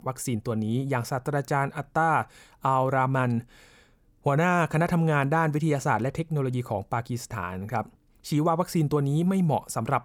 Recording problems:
none

